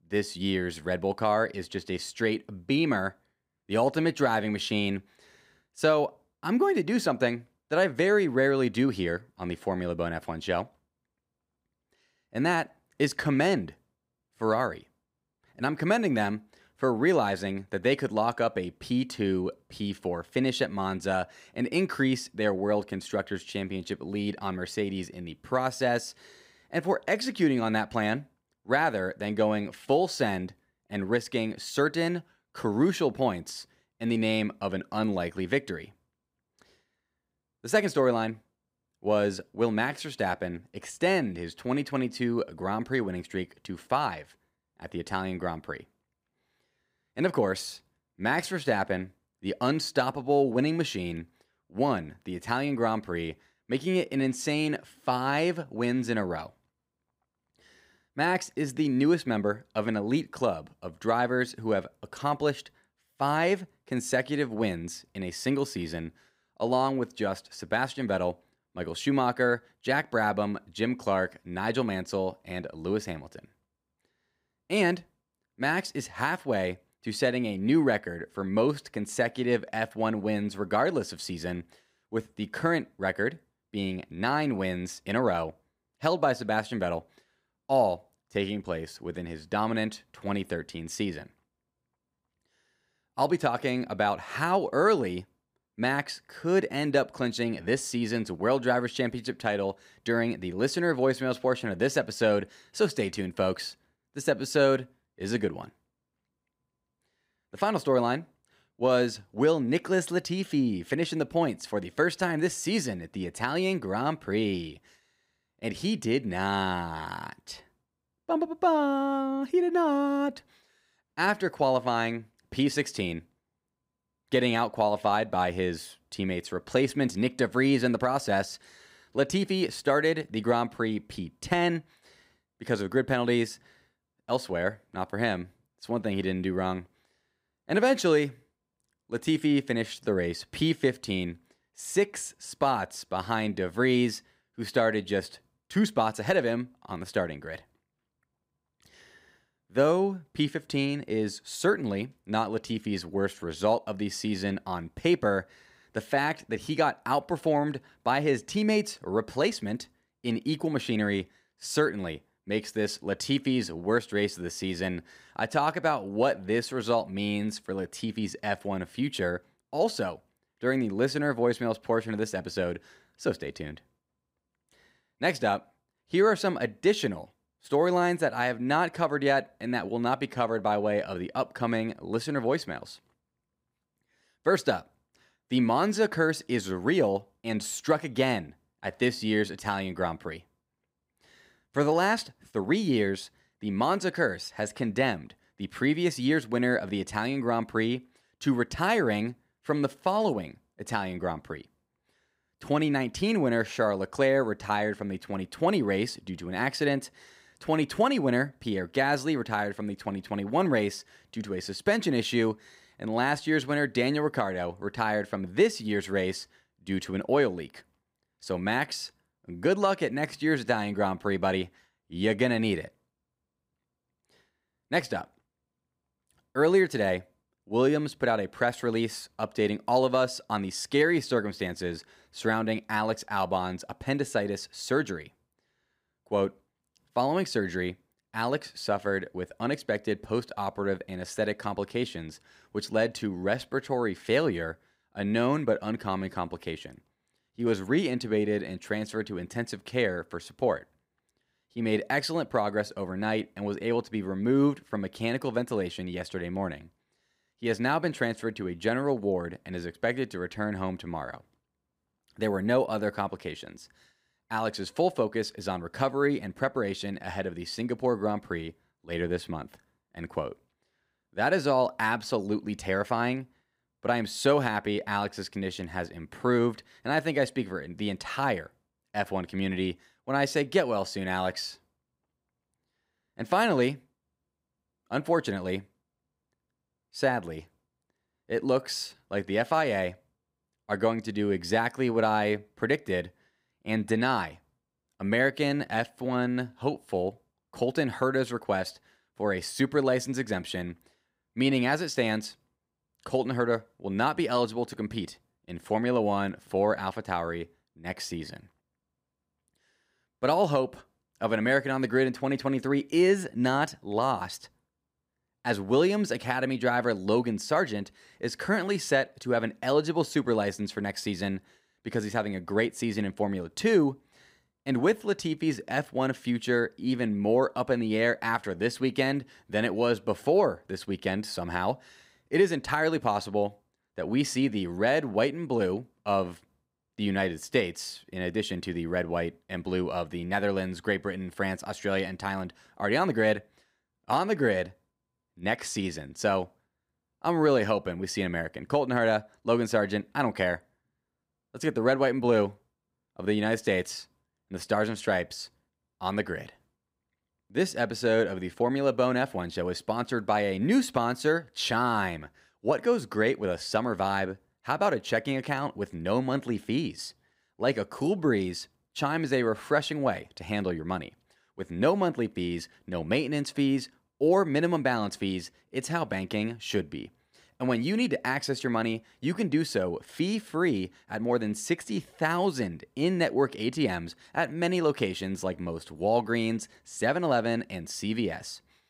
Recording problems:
none

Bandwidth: 15.5 kHz